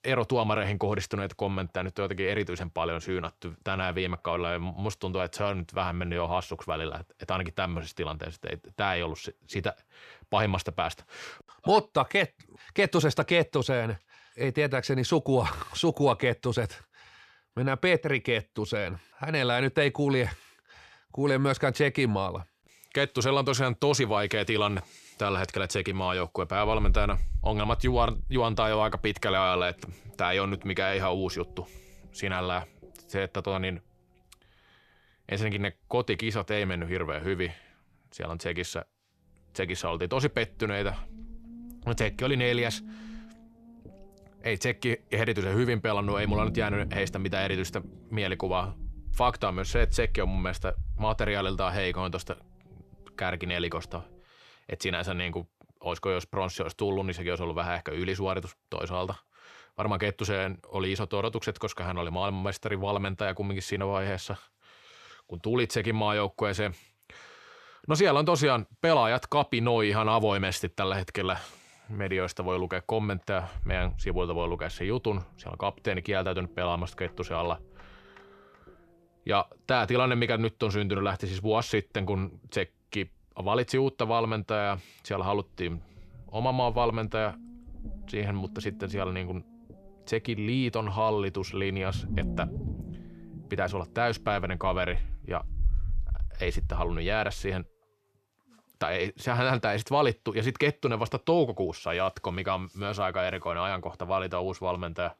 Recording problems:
low rumble; faint; from 27 to 54 s and from 1:14 to 1:38; 25 dB below the speech

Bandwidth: 14 kHz